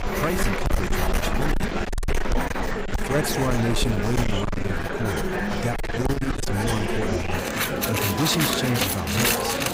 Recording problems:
distortion; heavy; 19% of the sound clipped
household noises; loud; throughout; 1 dB below the speech
murmuring crowd; loud; throughout; as loud as the speech
electrical hum; faint; throughout; 60 Hz, 20 dB below the speech

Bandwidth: 15.5 kHz